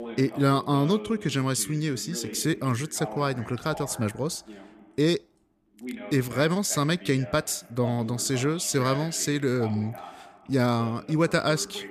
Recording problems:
voice in the background; noticeable; throughout; 15 dB below the speech

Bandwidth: 14.5 kHz